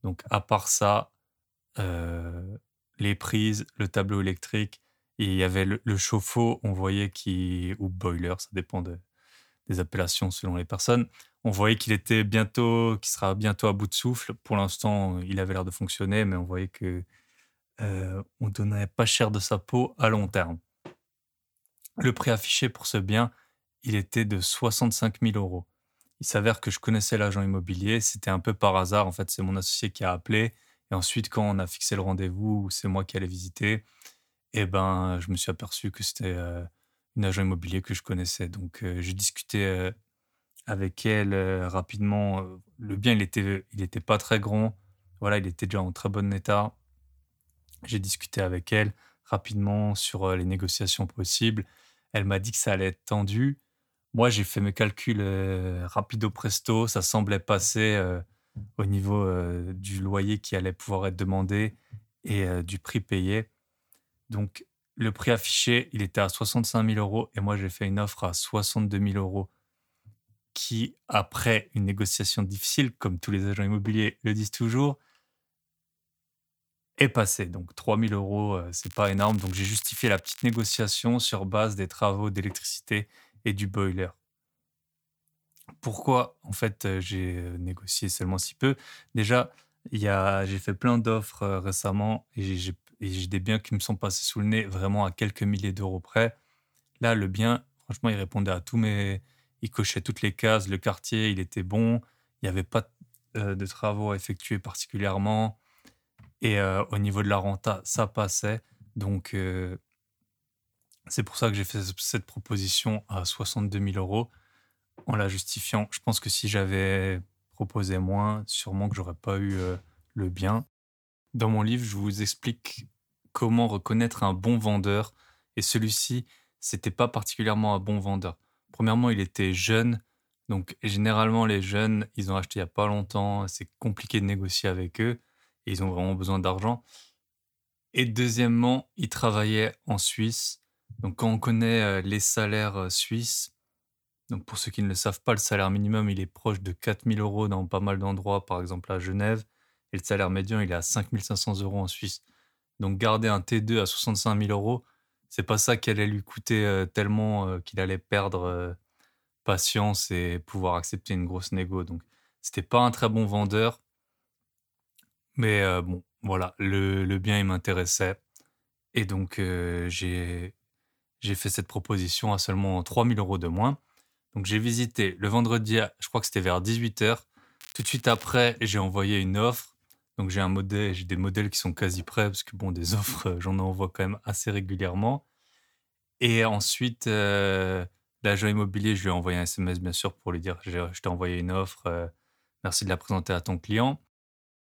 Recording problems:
crackling; noticeable; from 1:19 to 1:21 and at 2:58; 15 dB below the speech

